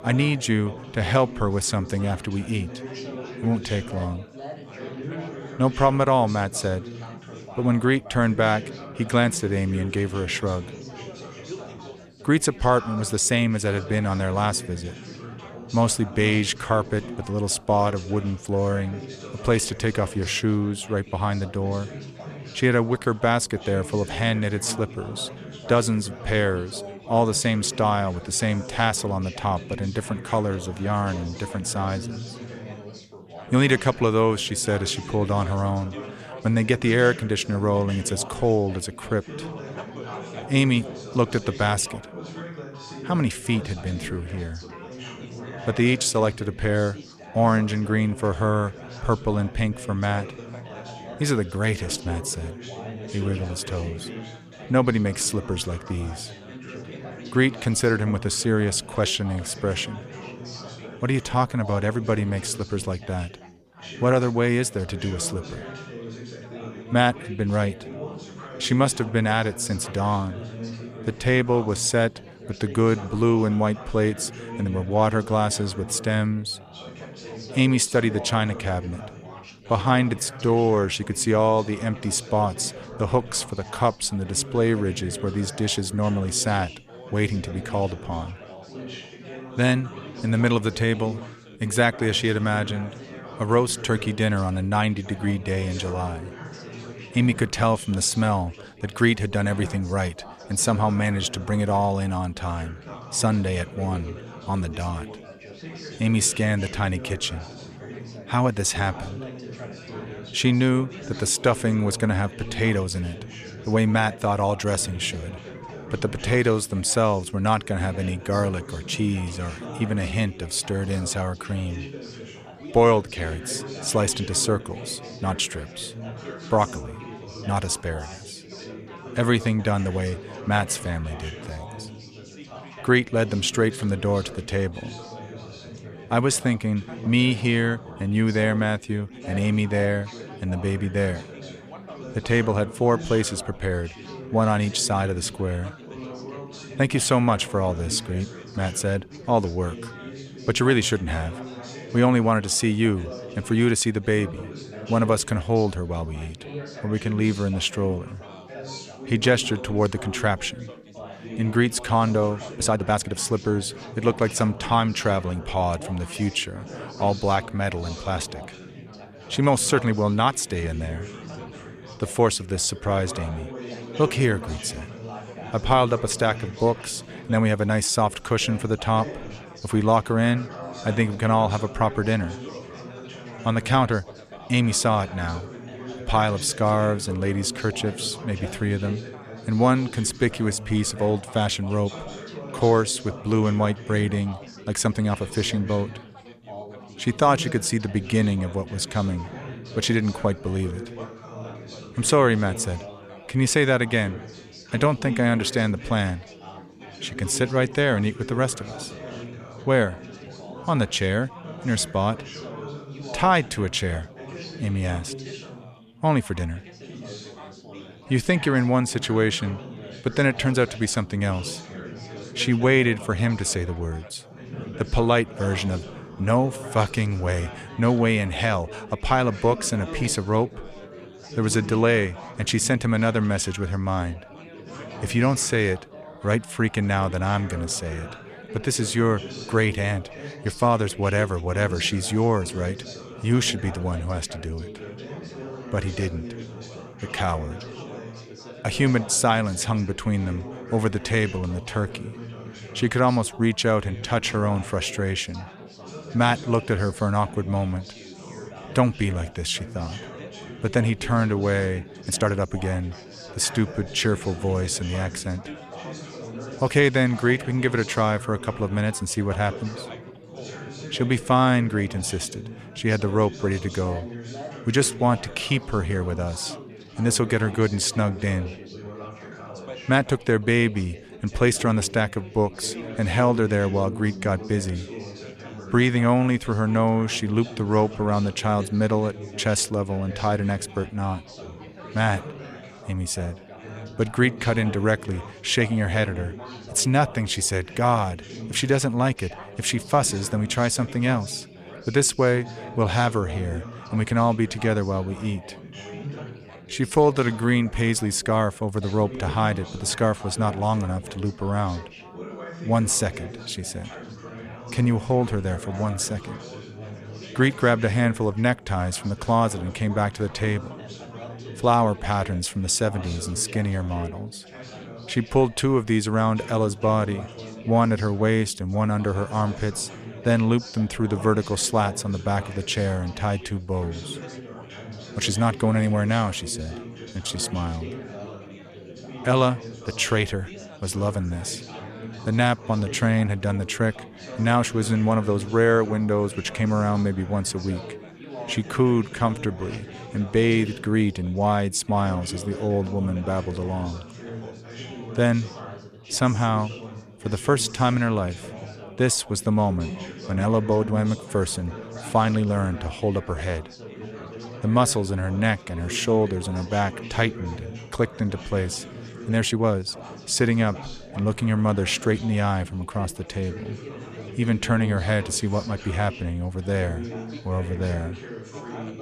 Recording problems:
chatter from many people; noticeable; throughout; 15 dB below the speech
uneven, jittery; strongly; from 1:20 to 6:10

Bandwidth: 14.5 kHz